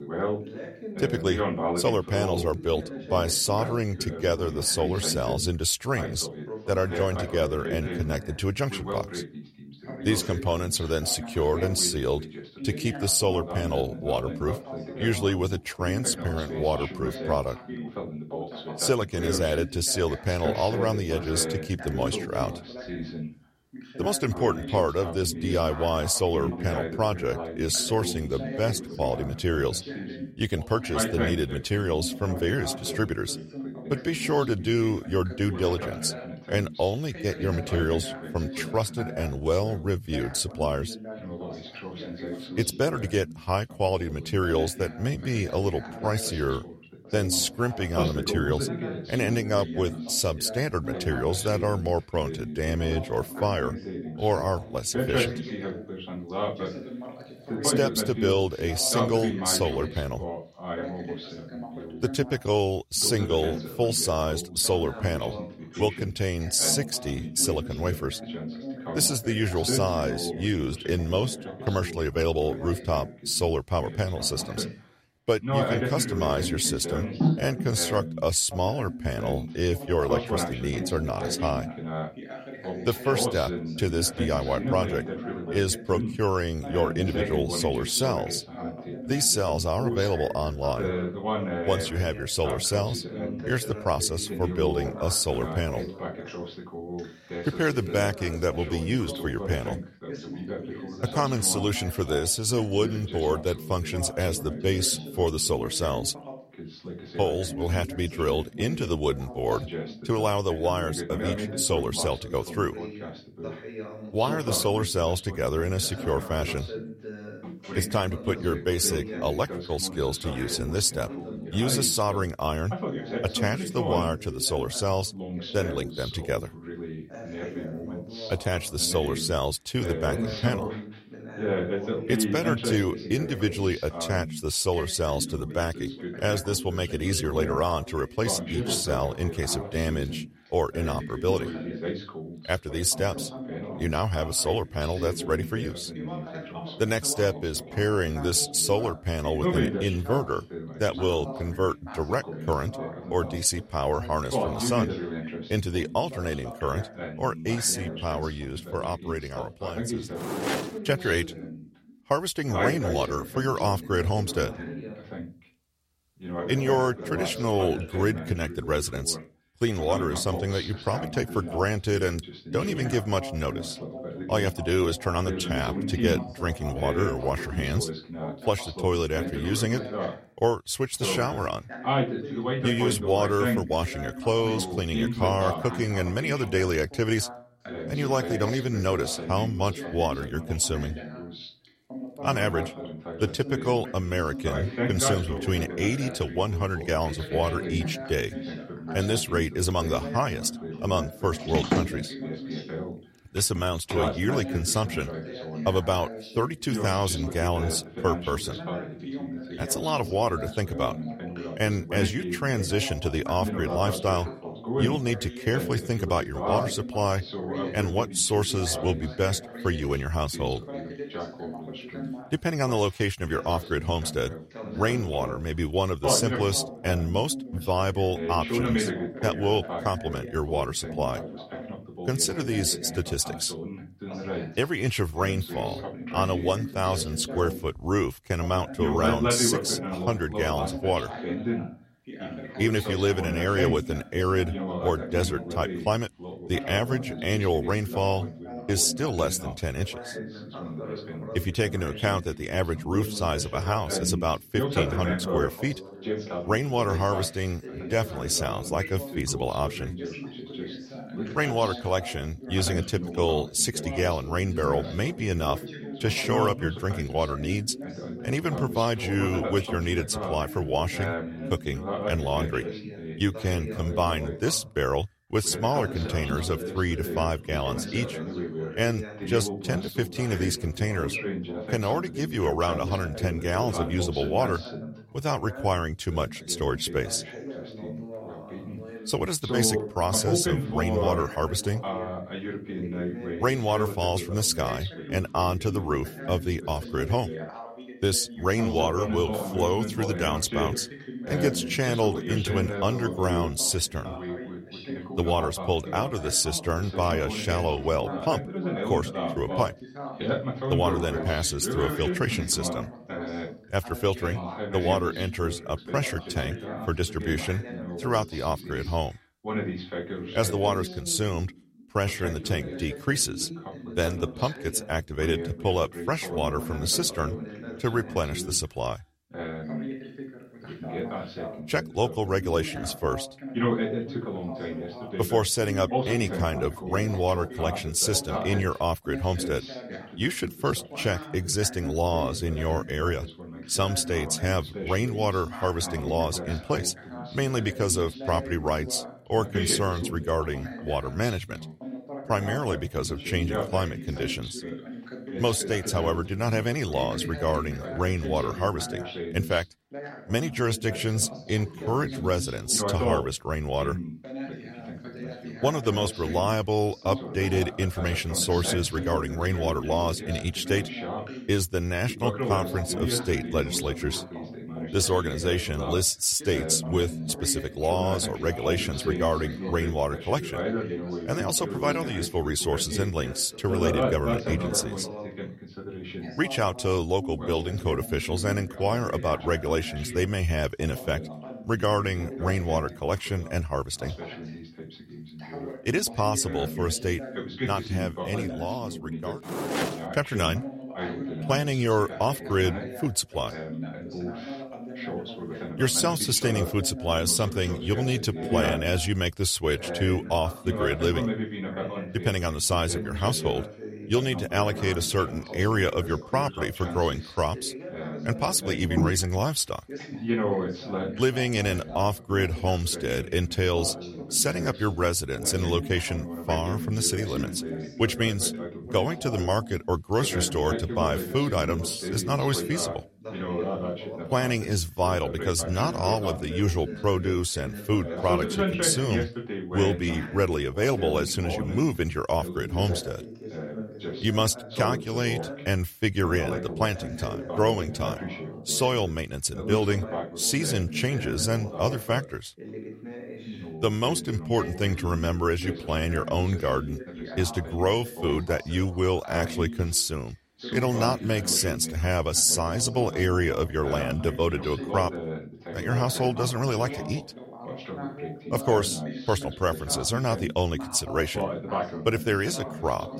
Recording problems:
background chatter; loud; throughout; 2 voices, 7 dB below the speech

